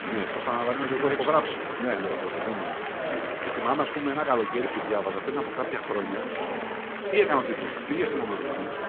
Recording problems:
echo of what is said; faint; throughout; 570 ms later, 20 dB below the speech
phone-call audio
chatter from many people; loud; throughout; 3 dB below the speech

